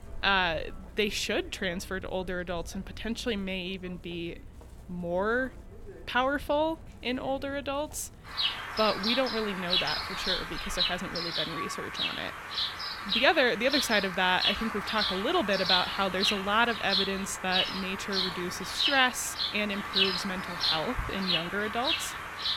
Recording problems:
animal sounds; very loud; throughout; as loud as the speech

